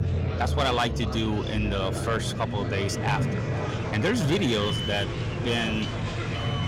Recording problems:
echo of what is said; noticeable; from 3 s on; 470 ms later, 15 dB below the speech
distortion; slight; 10 dB below the speech
murmuring crowd; loud; throughout; 8 dB below the speech
alarms or sirens; noticeable; throughout; 10 dB below the speech
low rumble; noticeable; throughout; 15 dB below the speech

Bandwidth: 16 kHz